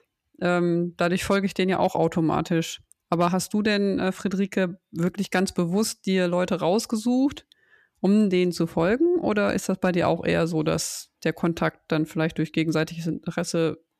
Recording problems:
none

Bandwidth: 14.5 kHz